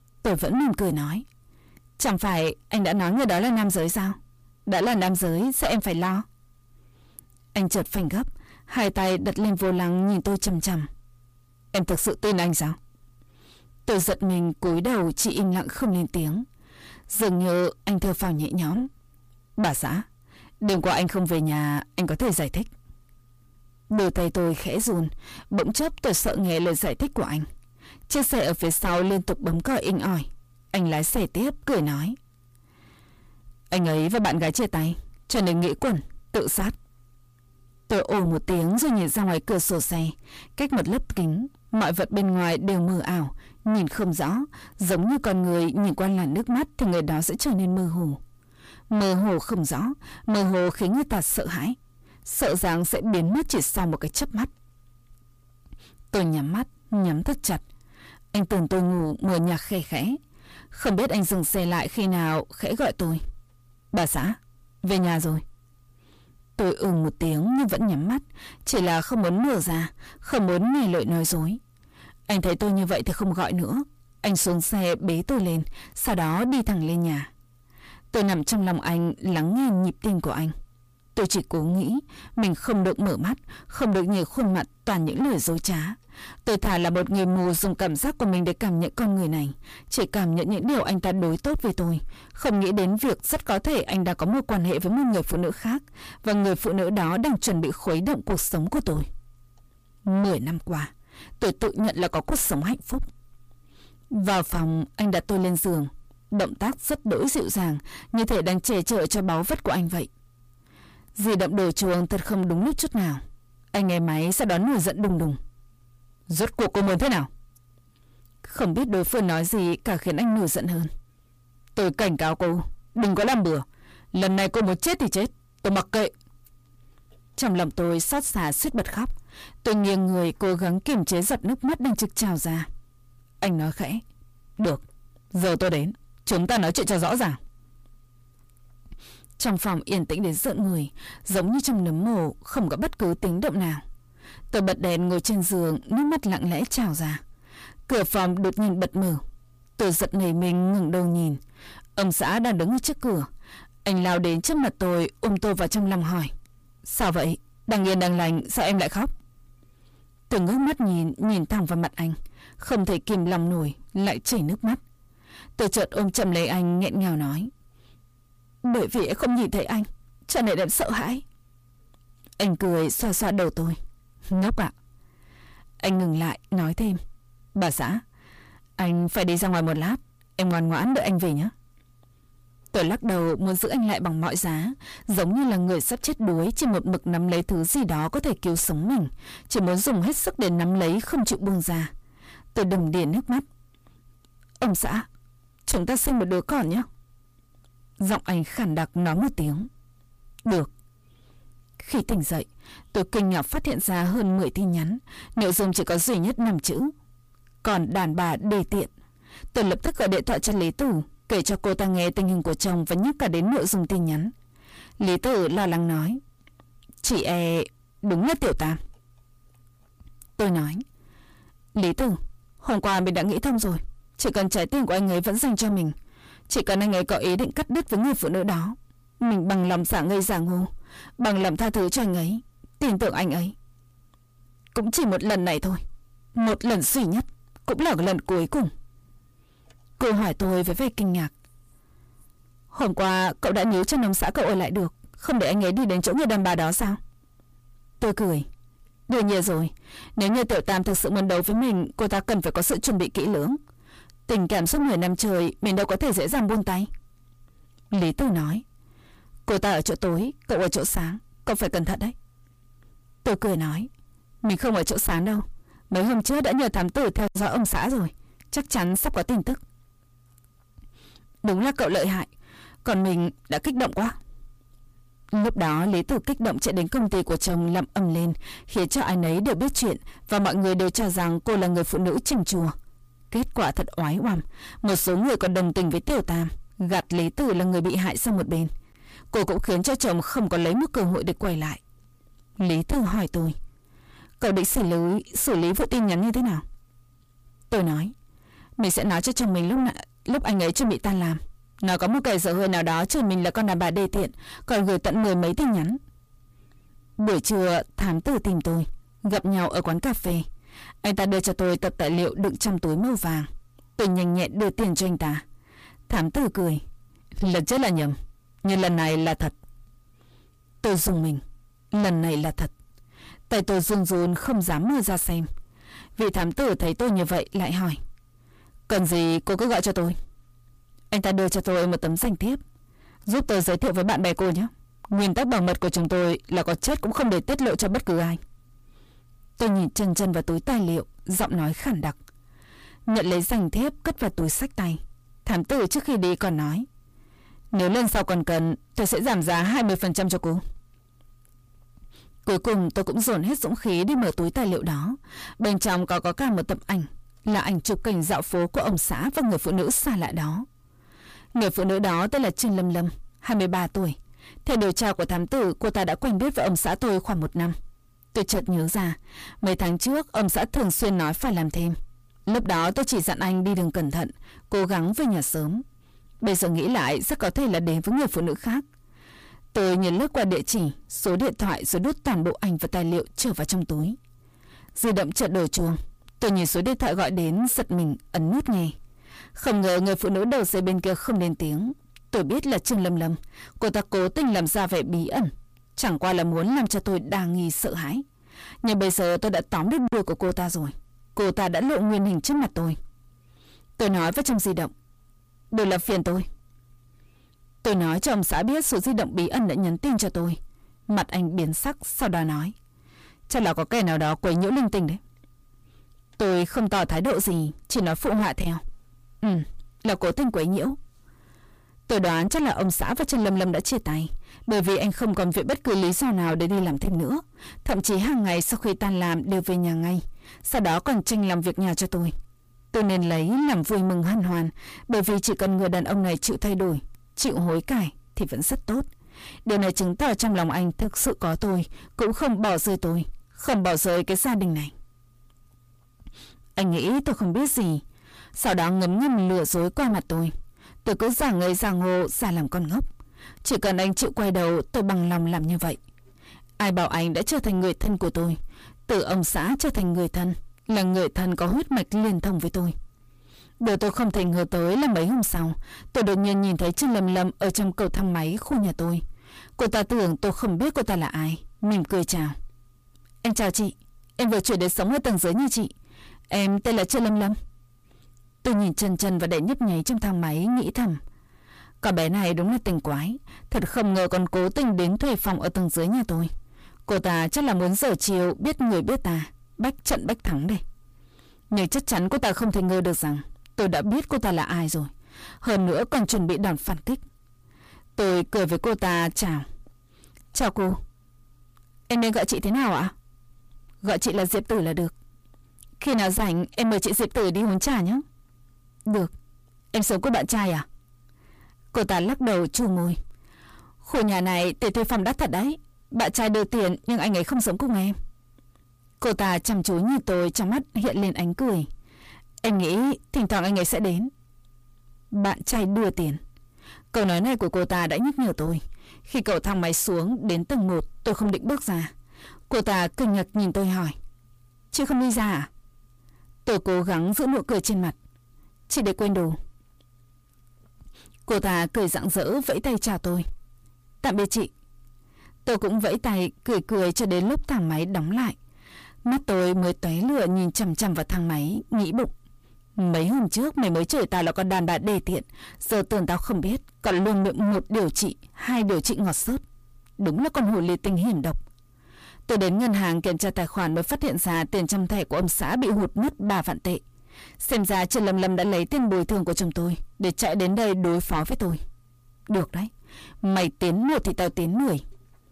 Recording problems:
distortion; heavy; 6 dB below the speech

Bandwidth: 15 kHz